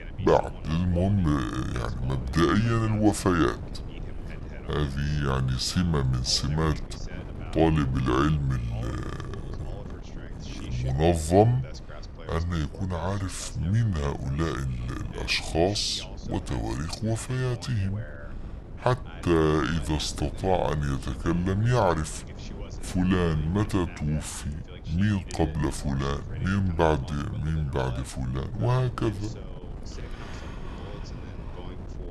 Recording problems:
wrong speed and pitch; too slow and too low; 0.6 times normal speed
wind noise on the microphone; occasional gusts; 20 dB below the speech
voice in the background; faint; throughout; 20 dB below the speech

